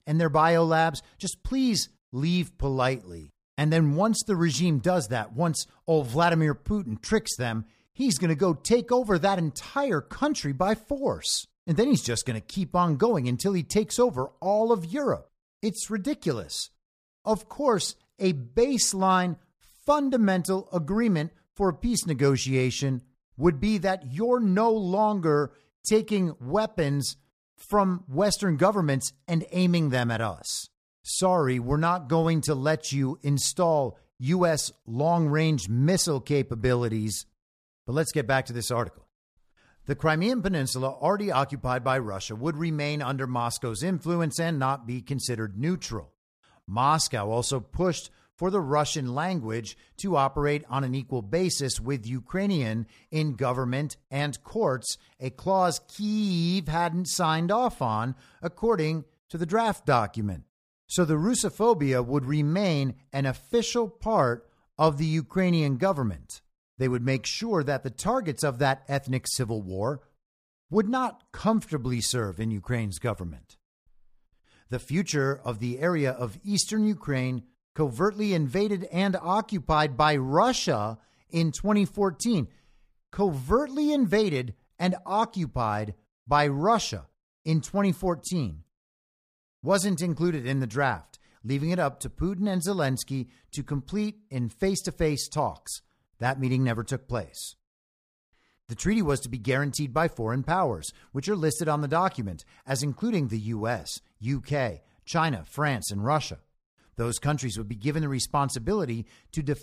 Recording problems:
none

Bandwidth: 14.5 kHz